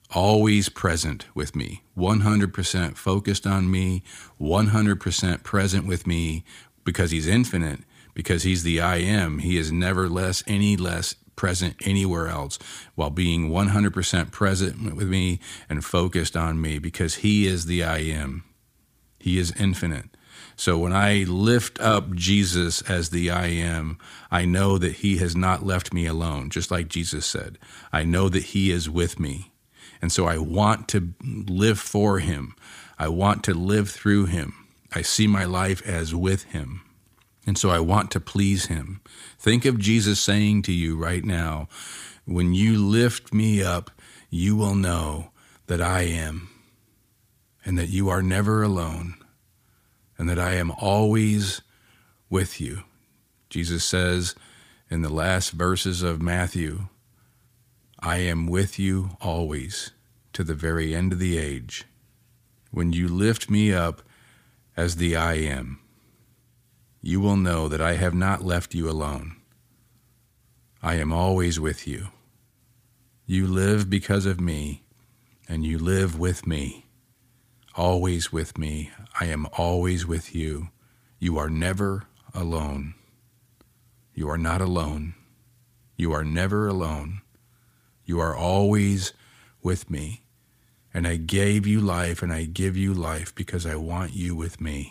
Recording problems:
none

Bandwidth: 15 kHz